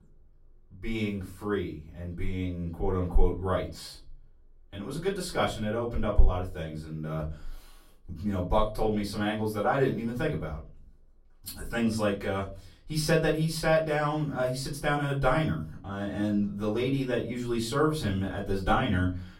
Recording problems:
off-mic speech; far
room echo; slight; dies away in 0.3 s

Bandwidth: 16 kHz